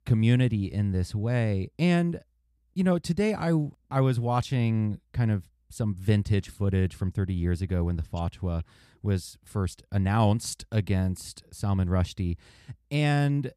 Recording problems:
none

